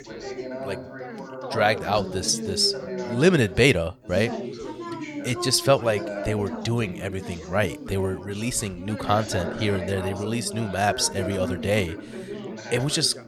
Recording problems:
background chatter; loud; throughout; 3 voices, 10 dB below the speech

